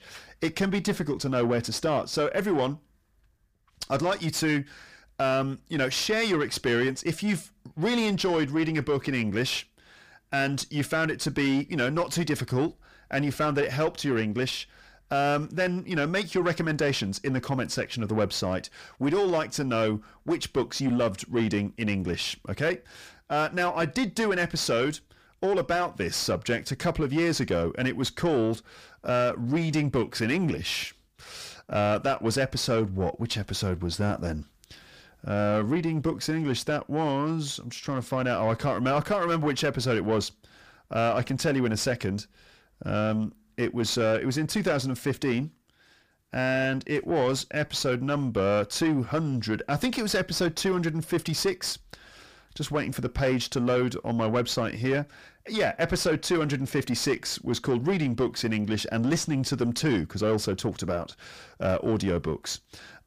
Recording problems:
distortion; slight; 9 dB below the speech

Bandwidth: 15 kHz